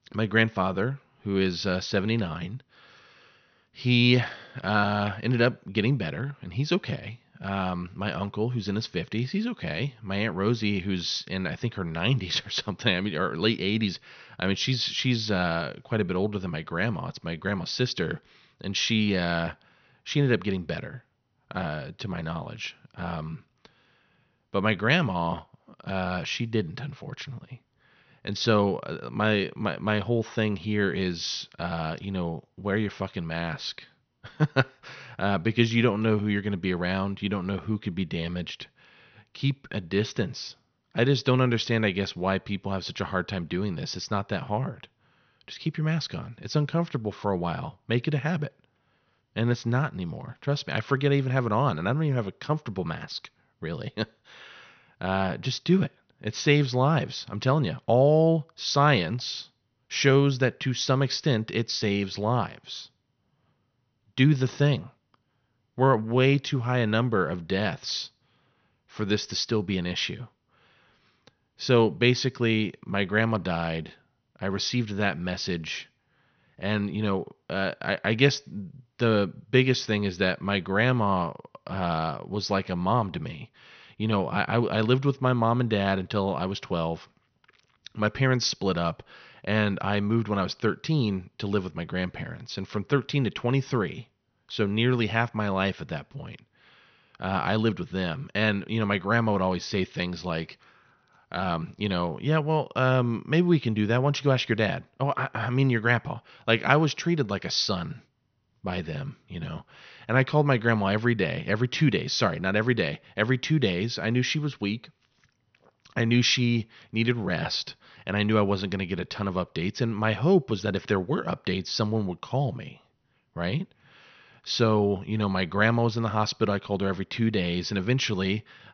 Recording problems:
high frequencies cut off; noticeable; nothing above 6 kHz

